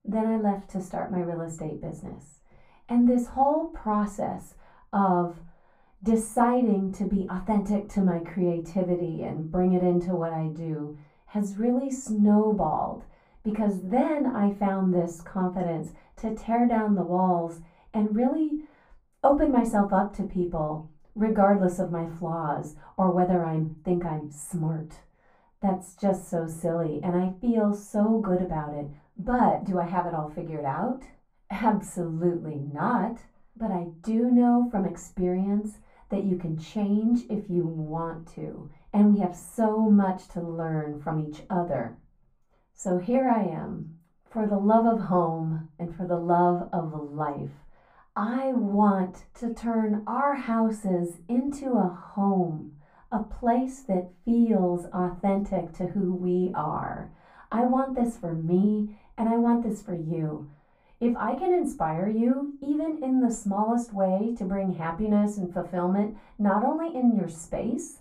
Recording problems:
off-mic speech; far
muffled; very; fading above 2 kHz
room echo; very slight; dies away in 0.2 s

